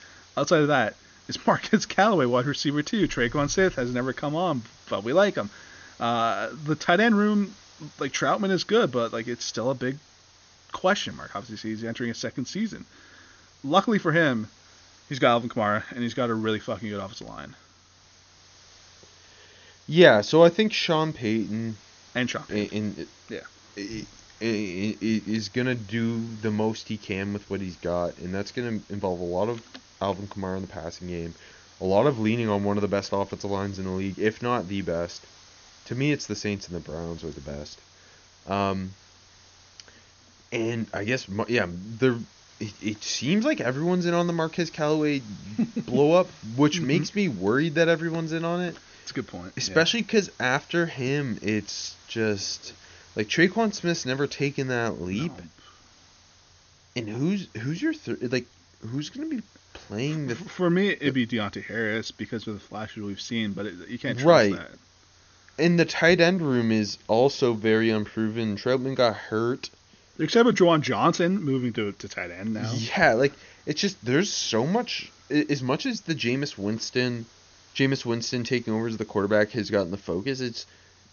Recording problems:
high frequencies cut off; noticeable; nothing above 6.5 kHz
hiss; faint; throughout; 25 dB below the speech

